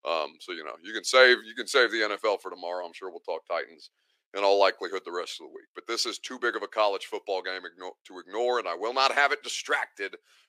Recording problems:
thin; very; fading below 350 Hz

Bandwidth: 15 kHz